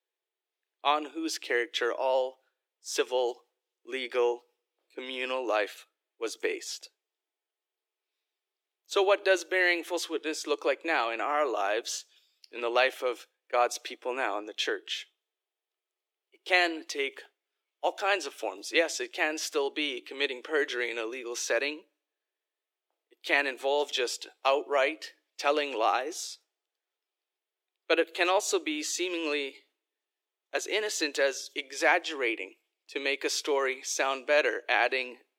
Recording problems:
thin; very; fading below 300 Hz

